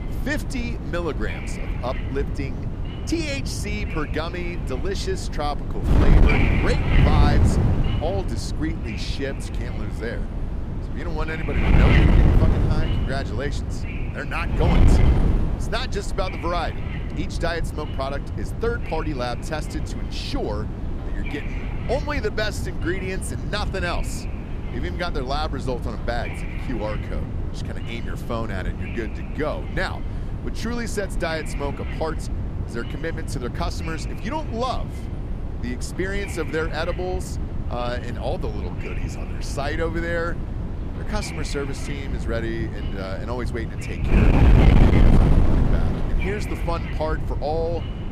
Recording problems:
wind noise on the microphone; heavy; 3 dB below the speech

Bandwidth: 14.5 kHz